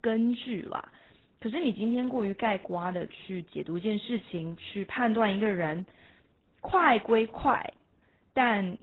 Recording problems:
garbled, watery; badly; nothing above 4 kHz

